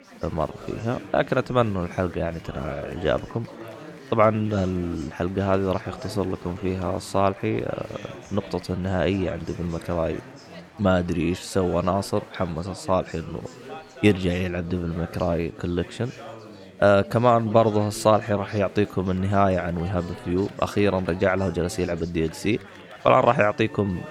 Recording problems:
chatter from many people; noticeable; throughout; 15 dB below the speech

